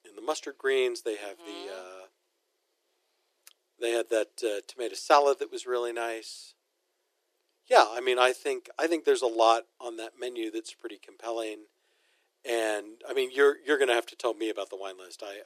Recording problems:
thin; very; fading below 350 Hz

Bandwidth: 14.5 kHz